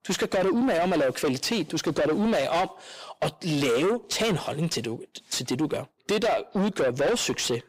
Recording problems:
distortion; heavy; 6 dB below the speech

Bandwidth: 15.5 kHz